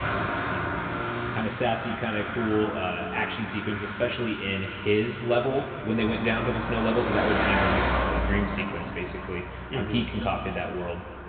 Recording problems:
high frequencies cut off; severe; nothing above 4 kHz
room echo; noticeable; dies away in 2.3 s
off-mic speech; somewhat distant
garbled, watery; slightly
traffic noise; loud; throughout; 3 dB below the speech

